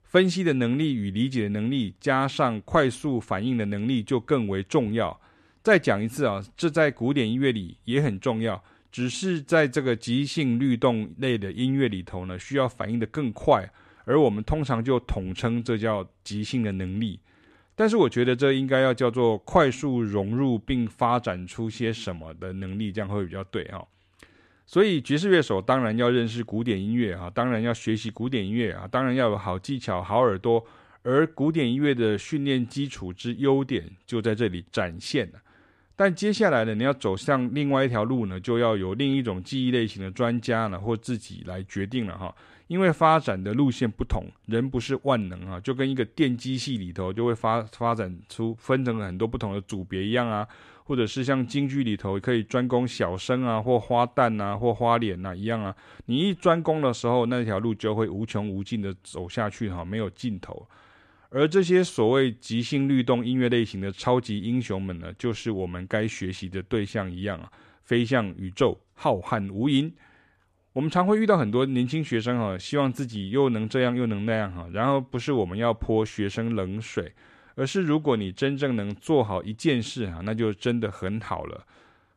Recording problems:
none

